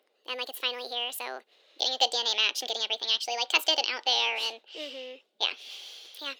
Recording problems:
thin; very; fading below 450 Hz
wrong speed and pitch; too fast and too high; 1.5 times normal speed

